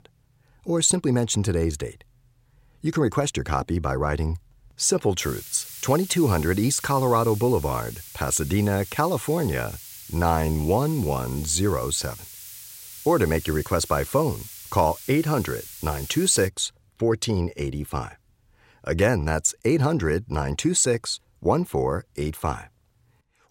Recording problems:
hiss; noticeable; from 5 to 16 s; 15 dB below the speech

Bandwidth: 16 kHz